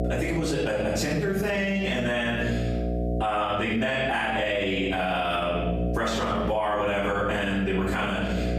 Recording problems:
off-mic speech; far
room echo; noticeable; dies away in 0.8 s
squashed, flat; somewhat
electrical hum; noticeable; throughout; 60 Hz, 15 dB below the speech

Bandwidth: 15 kHz